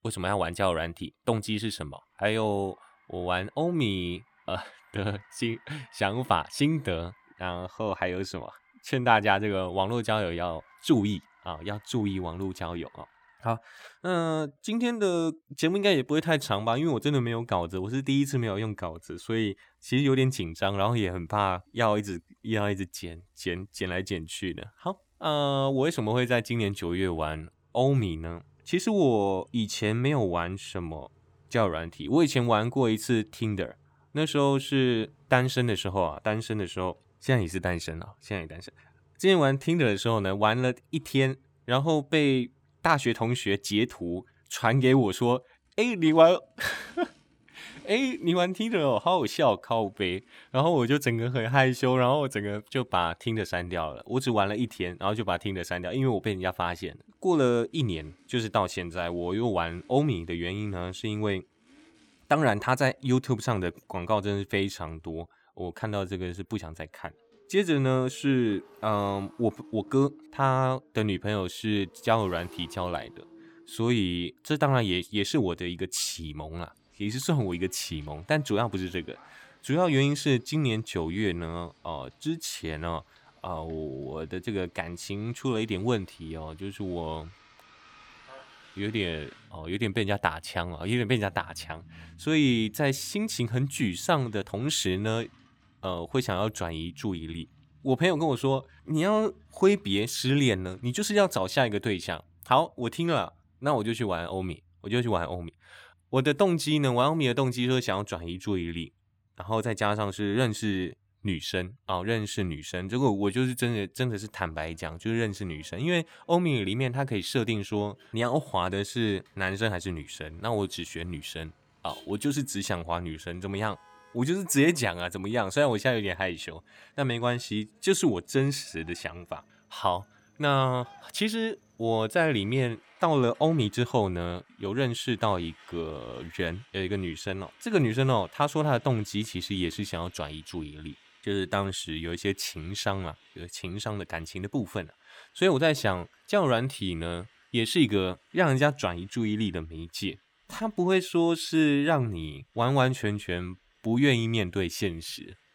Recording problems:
traffic noise; faint; throughout; 30 dB below the speech

